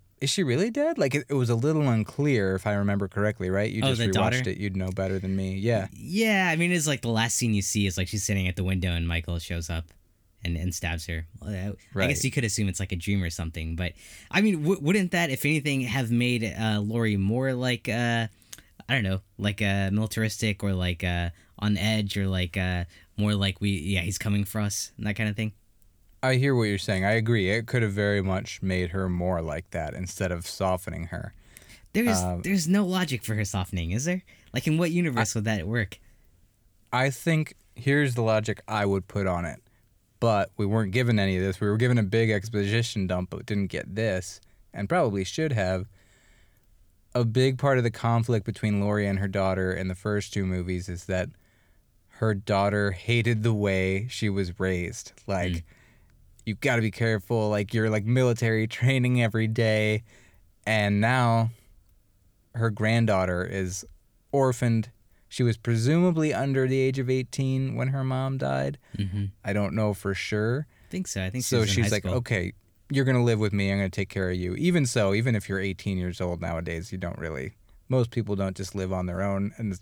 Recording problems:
none

